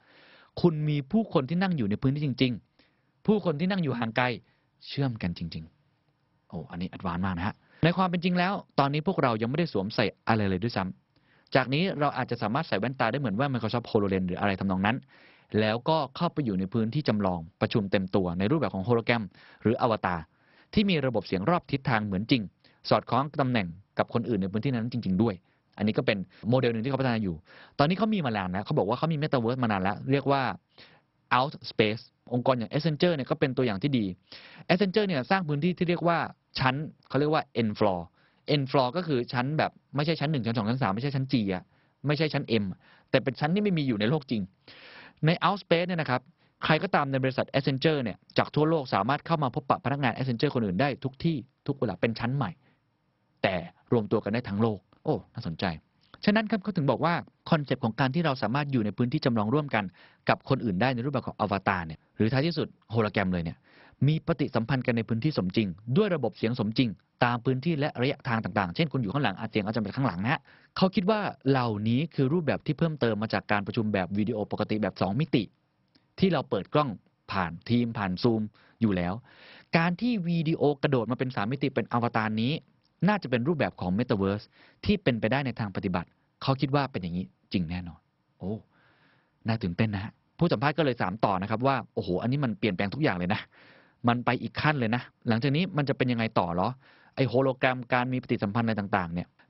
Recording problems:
garbled, watery; badly; nothing above 5.5 kHz

